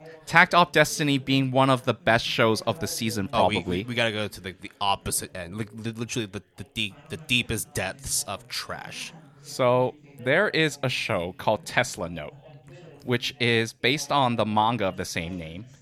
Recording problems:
background chatter; faint; throughout; 3 voices, 25 dB below the speech

